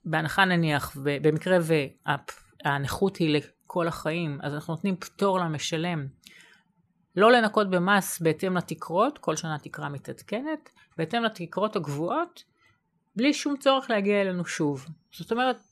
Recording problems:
none

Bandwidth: 13.5 kHz